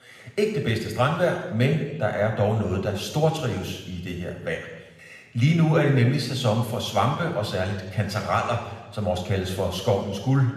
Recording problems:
room echo; noticeable; dies away in 1.1 s
off-mic speech; somewhat distant

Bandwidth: 14.5 kHz